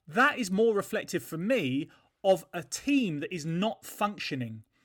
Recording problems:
none

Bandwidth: 17.5 kHz